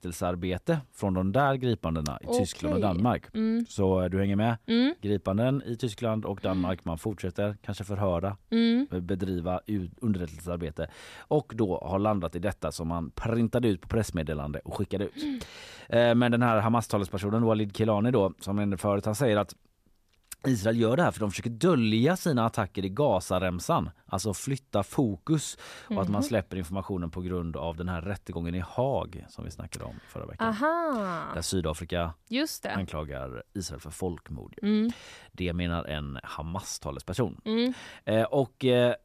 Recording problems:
none

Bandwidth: 14.5 kHz